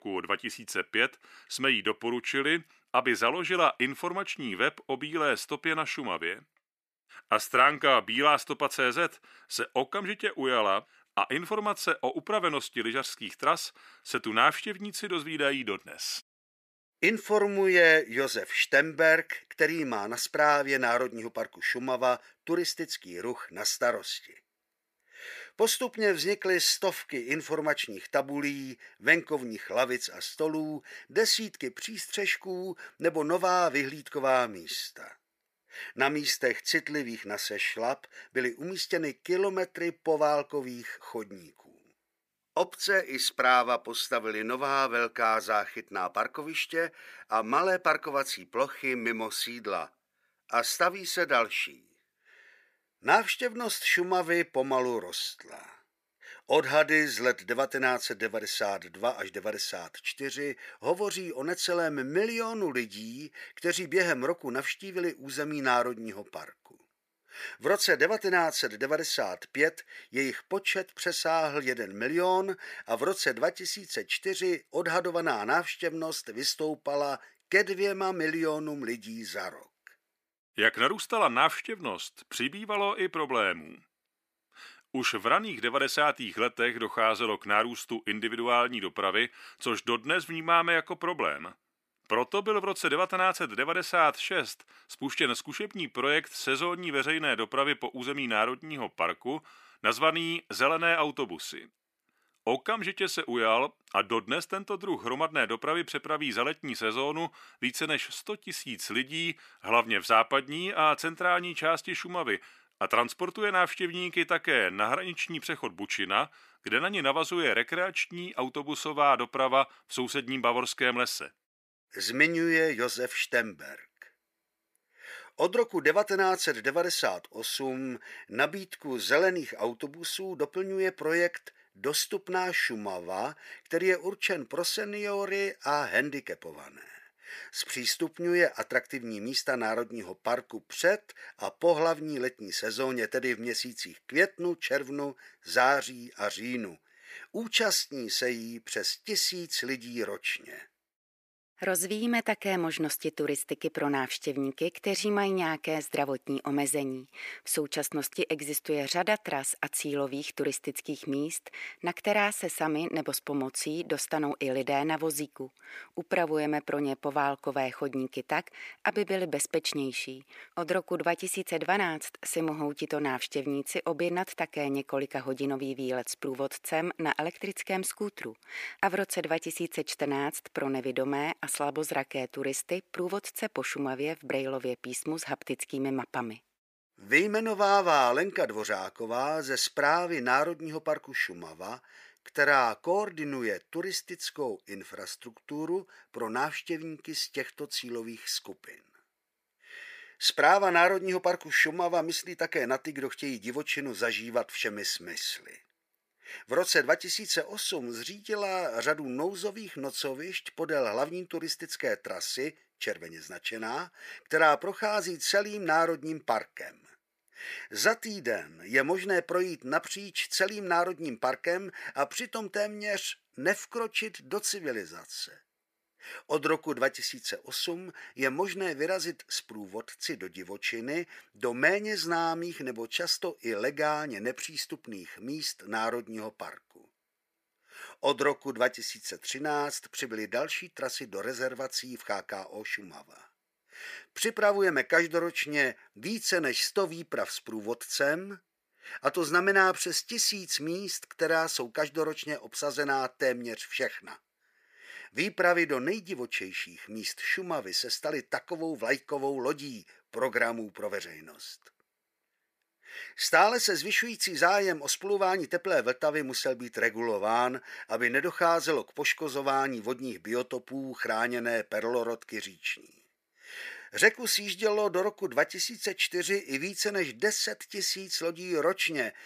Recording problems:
thin; somewhat; fading below 400 Hz

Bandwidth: 15 kHz